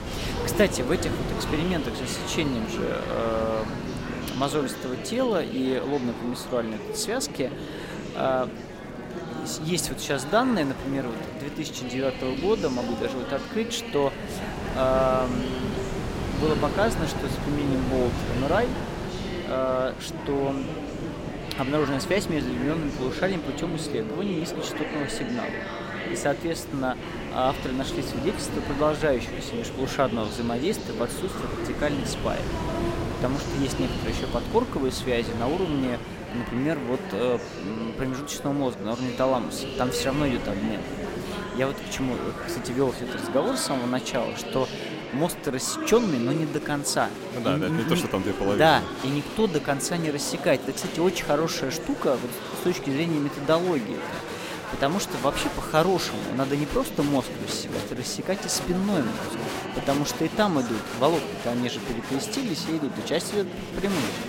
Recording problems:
murmuring crowd; loud; throughout; 6 dB below the speech
wind noise on the microphone; occasional gusts; until 43 s; 10 dB below the speech

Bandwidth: 16 kHz